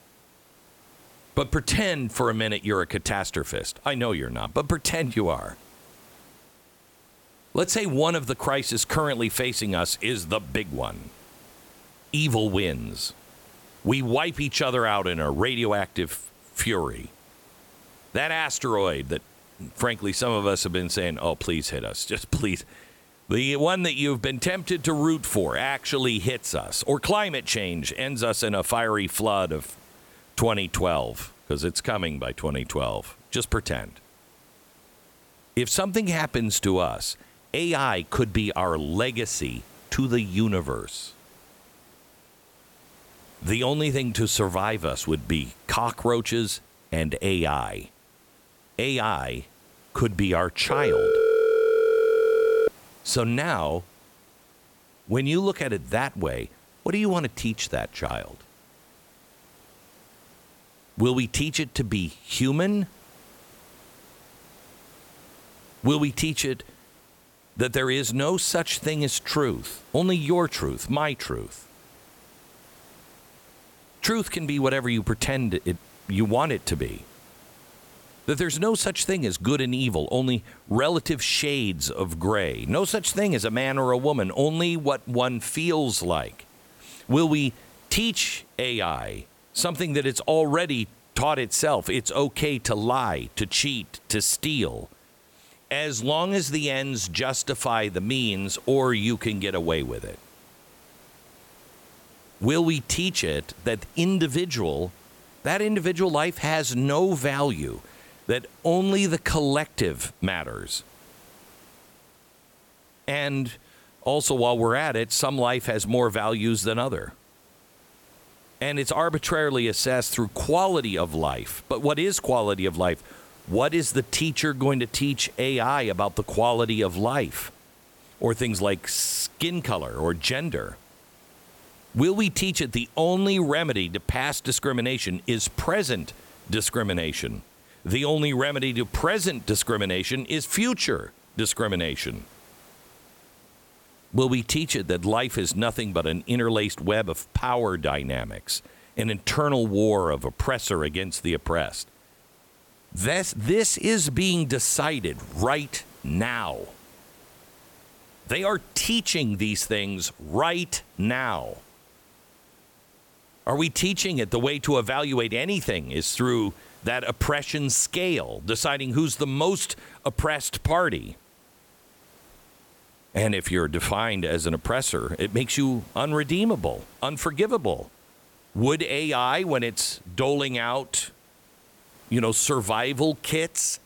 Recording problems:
hiss; faint; throughout; 25 dB below the speech
phone ringing; loud; from 51 to 53 s; peak 5 dB above the speech

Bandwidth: 17.5 kHz